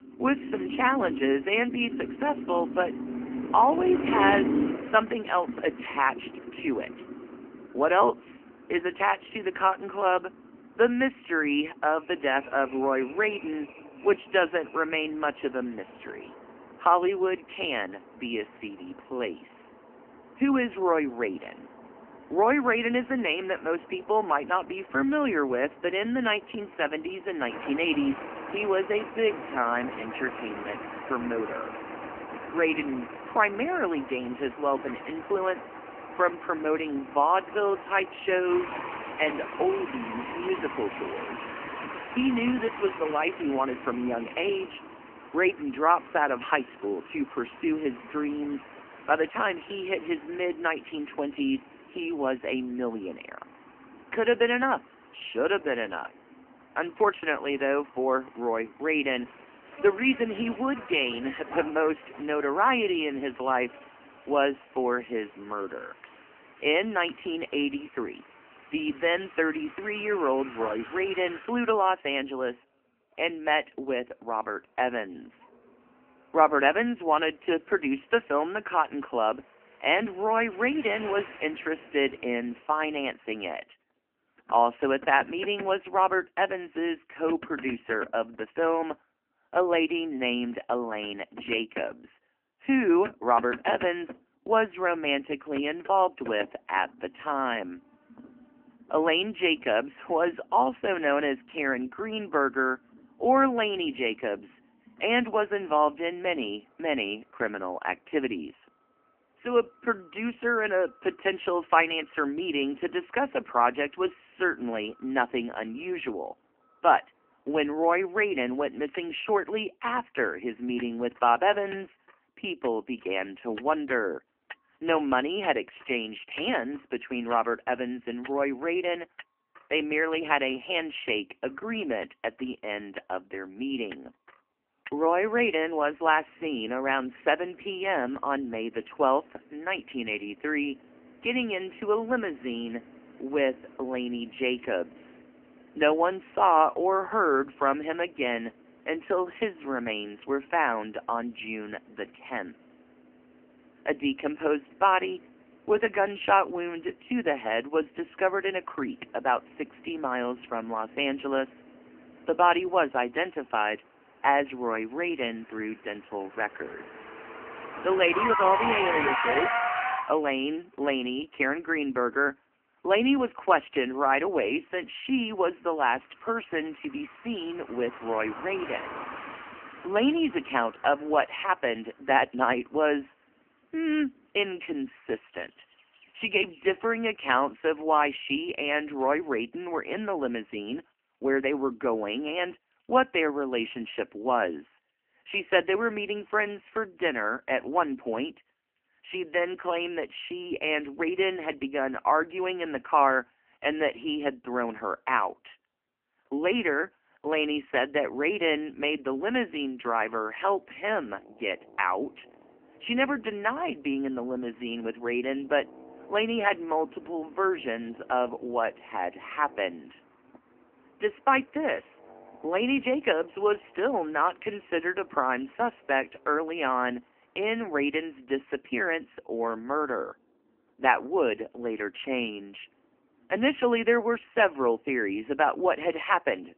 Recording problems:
phone-call audio; poor line; nothing above 3 kHz
traffic noise; noticeable; throughout; 10 dB below the speech

